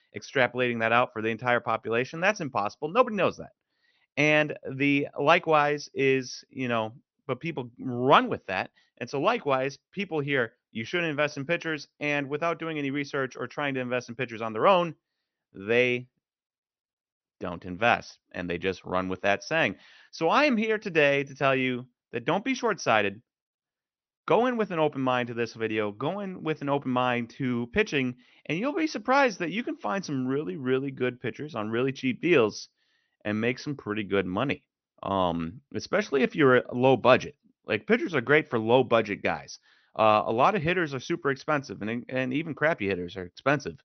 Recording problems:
high frequencies cut off; noticeable; nothing above 6 kHz

